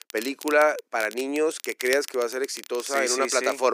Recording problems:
thin; somewhat; fading below 300 Hz
crackle, like an old record; noticeable; 15 dB below the speech
abrupt cut into speech; at the end

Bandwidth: 15 kHz